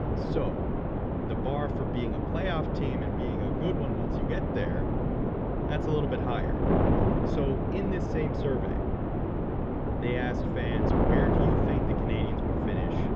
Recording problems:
muffled; very; fading above 3.5 kHz
wind noise on the microphone; heavy; 4 dB above the speech

